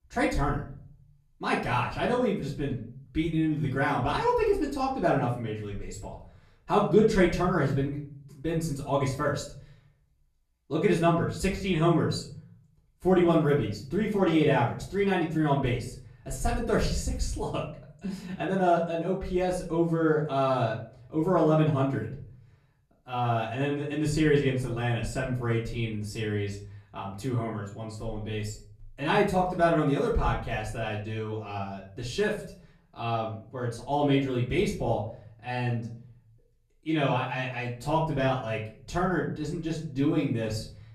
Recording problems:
off-mic speech; far
room echo; slight; dies away in 0.5 s

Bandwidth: 14 kHz